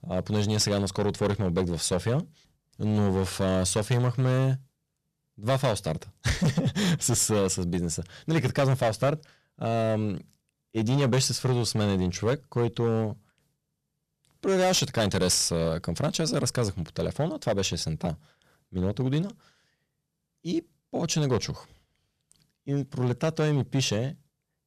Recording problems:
distortion; slight; 7% of the sound clipped

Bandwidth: 14 kHz